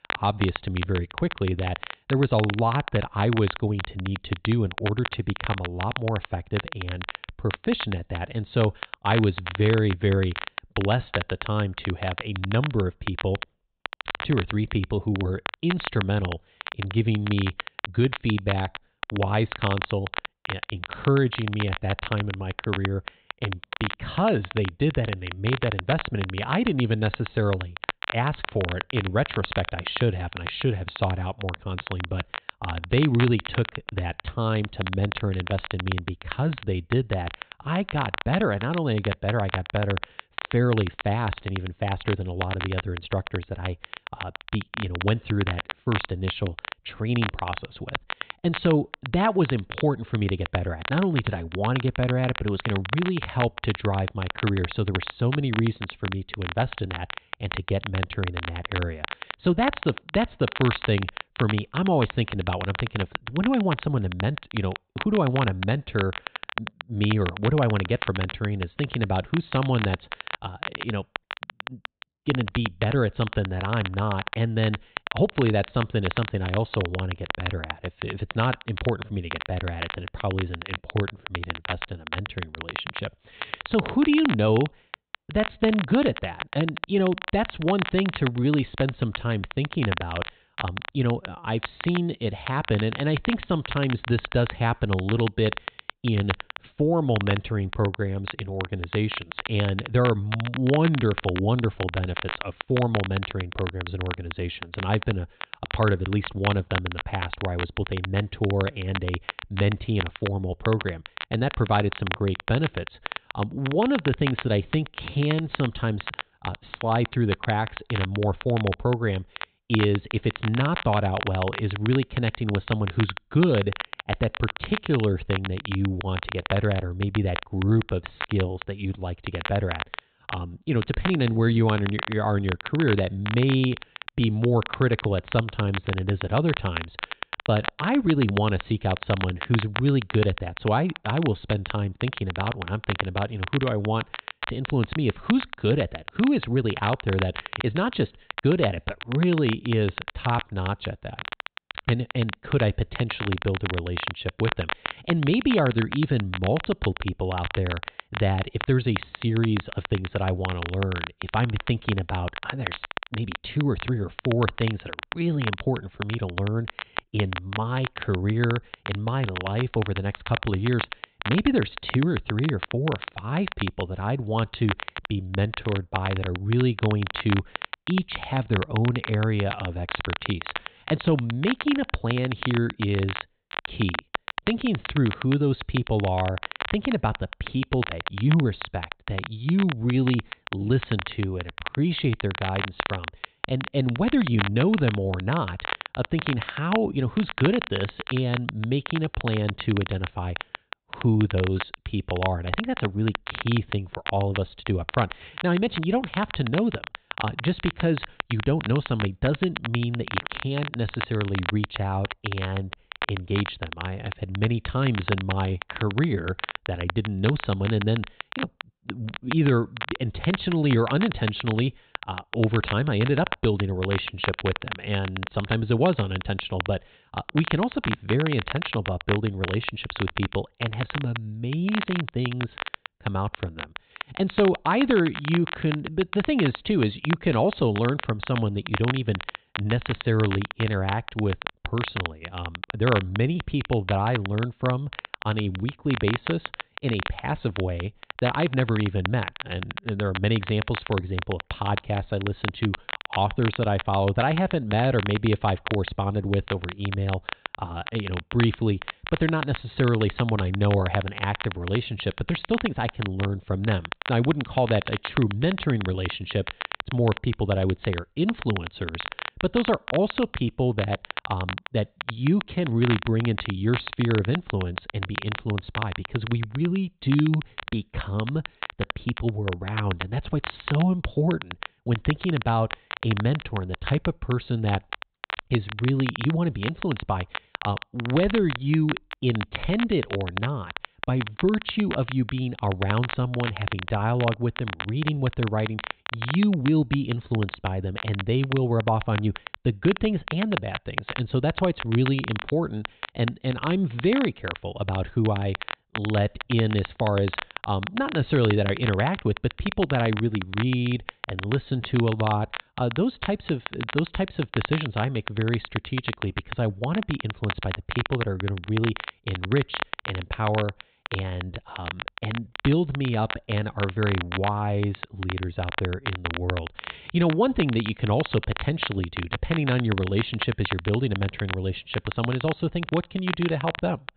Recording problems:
high frequencies cut off; severe; nothing above 4 kHz
crackle, like an old record; loud; 8 dB below the speech

